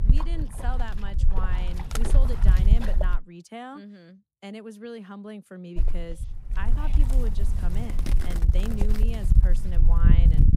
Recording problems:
wind noise on the microphone; heavy; until 3 s and from 6 s on; as loud as the speech

